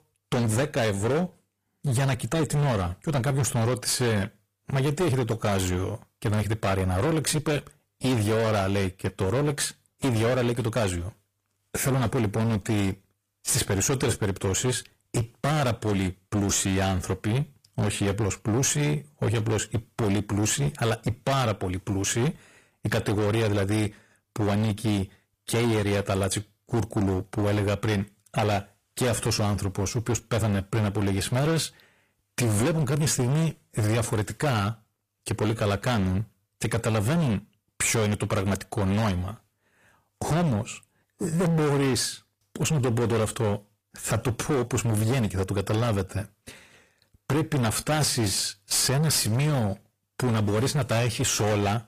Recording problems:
distortion; heavy; 23% of the sound clipped
garbled, watery; slightly; nothing above 15 kHz

